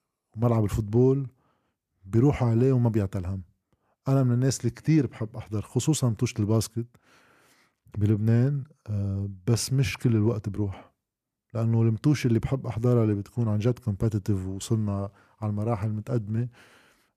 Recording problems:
none

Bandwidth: 14.5 kHz